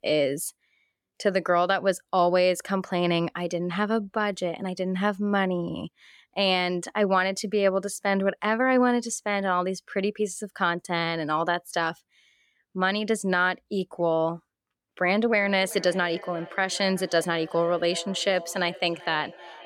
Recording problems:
echo of what is said; noticeable; from 15 s on; 380 ms later, 20 dB below the speech

